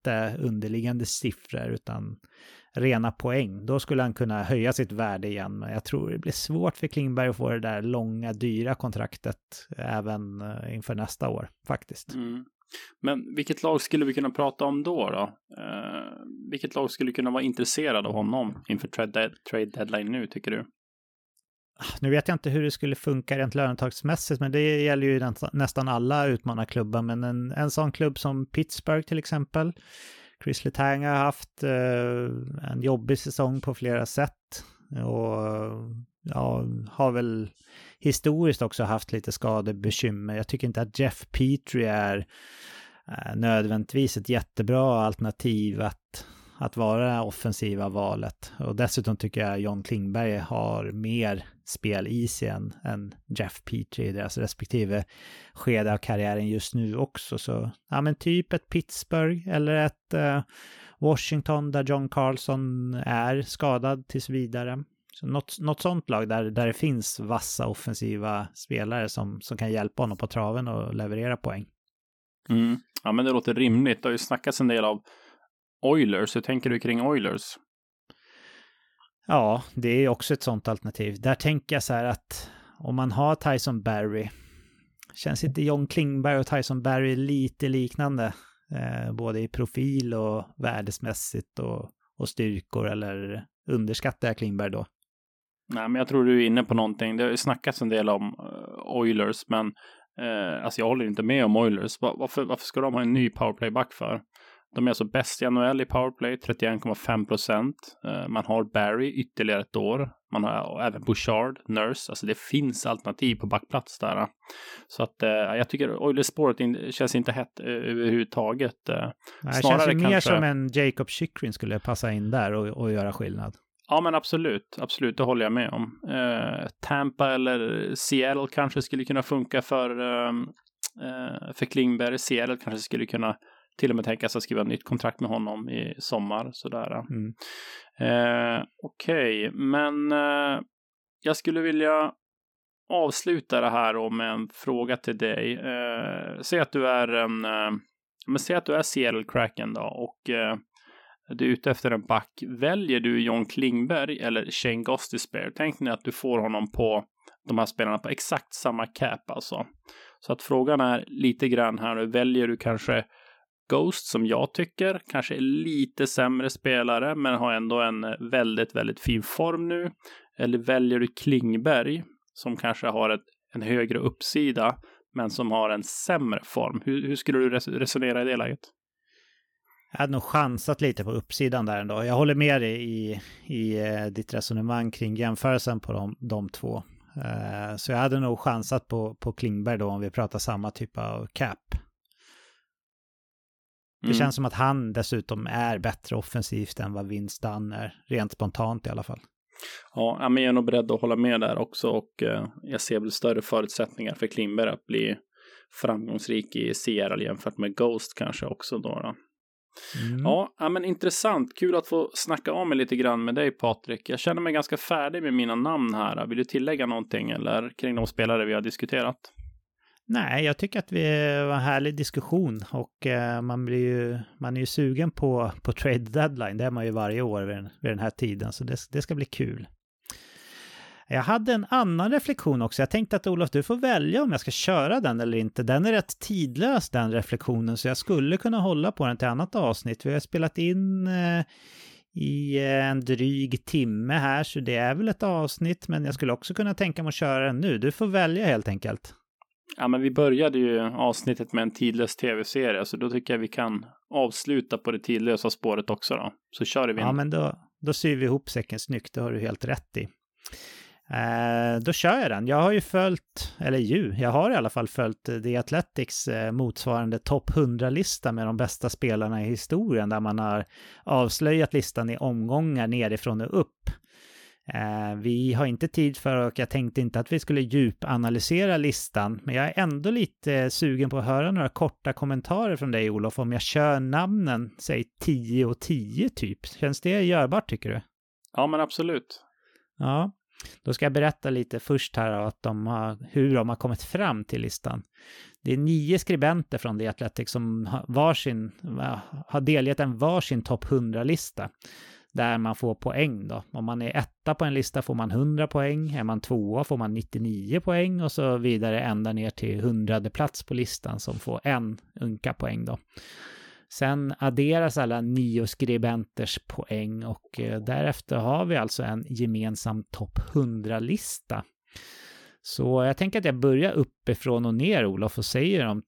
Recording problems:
none

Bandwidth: 18 kHz